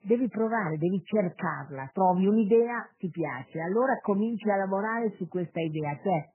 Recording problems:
garbled, watery; badly; nothing above 3 kHz

